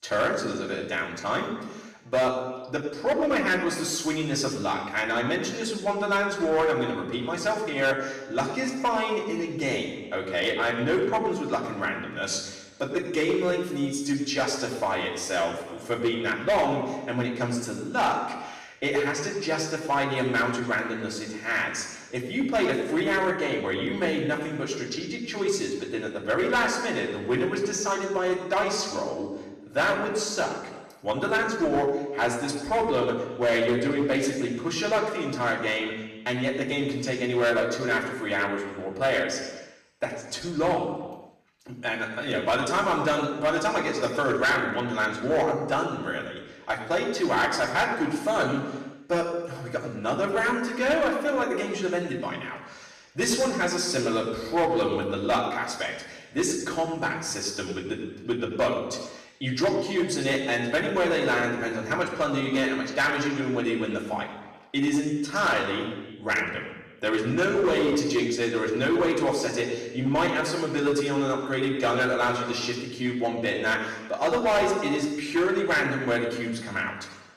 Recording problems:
off-mic speech; far
room echo; noticeable; dies away in 1.1 s
distortion; slight; 5% of the sound clipped

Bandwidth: 14 kHz